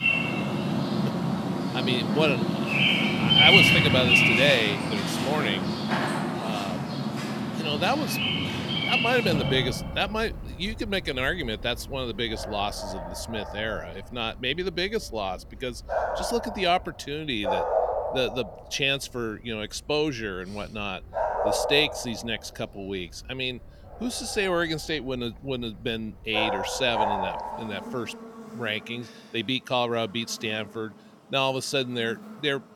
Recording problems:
animal sounds; very loud; throughout; 3 dB above the speech

